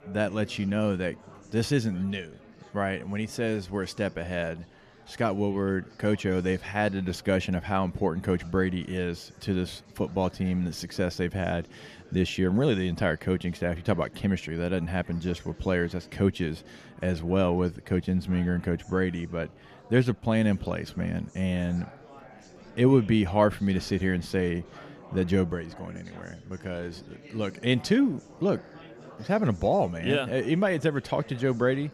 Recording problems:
chatter from many people; faint; throughout; 20 dB below the speech

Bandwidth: 14.5 kHz